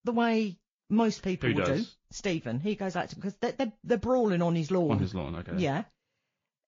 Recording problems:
garbled, watery; slightly; nothing above 6.5 kHz

